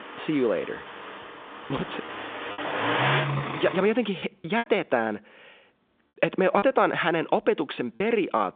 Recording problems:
phone-call audio
traffic noise; loud; until 4 s; 5 dB below the speech
choppy; occasionally; 5% of the speech affected

